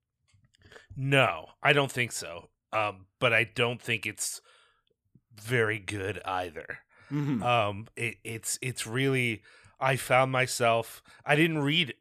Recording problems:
none

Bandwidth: 15 kHz